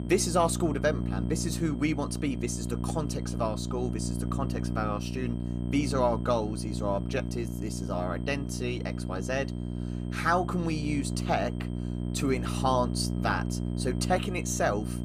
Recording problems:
electrical hum; noticeable; throughout; 60 Hz, 10 dB below the speech
high-pitched whine; faint; throughout; 3 kHz, 30 dB below the speech

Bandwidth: 14.5 kHz